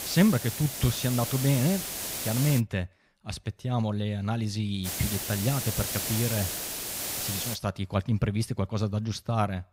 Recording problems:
hiss; loud; until 2.5 s and from 5 to 7.5 s; 3 dB below the speech

